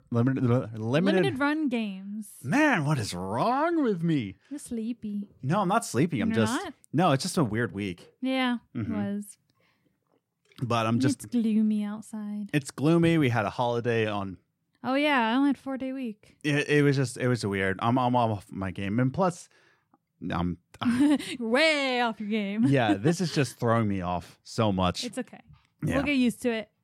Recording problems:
none

